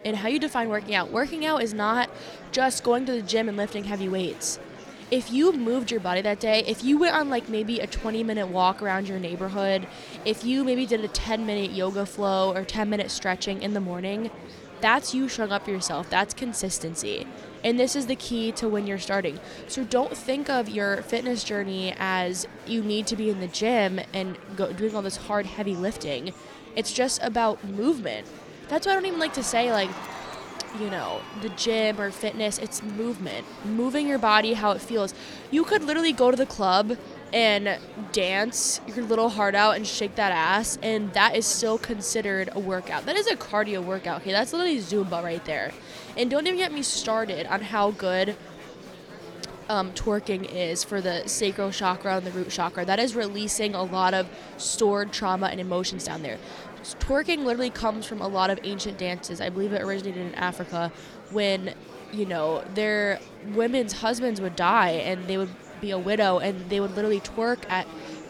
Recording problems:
murmuring crowd; noticeable; throughout; 15 dB below the speech

